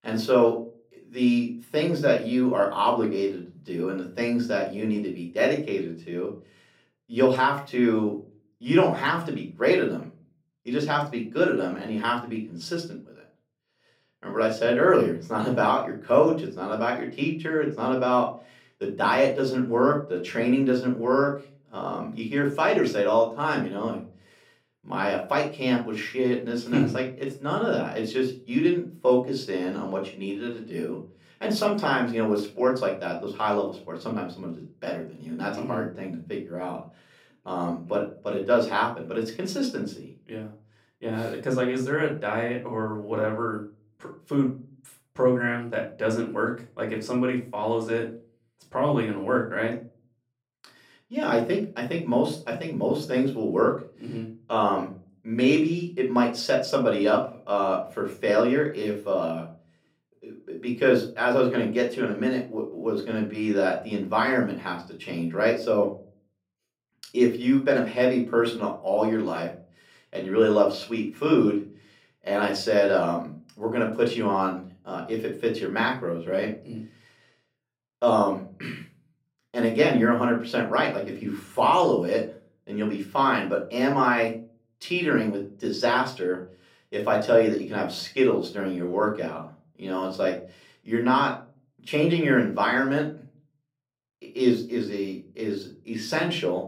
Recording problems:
room echo; slight; dies away in 0.4 s
off-mic speech; somewhat distant

